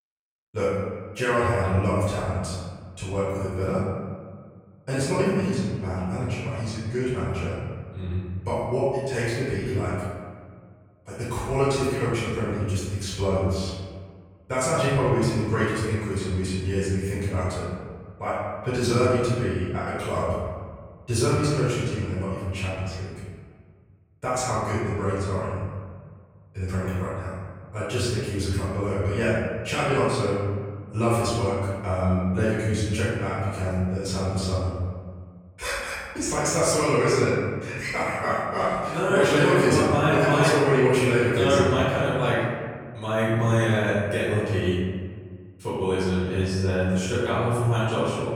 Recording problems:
room echo; strong; dies away in 1.5 s
off-mic speech; far

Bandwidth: 18 kHz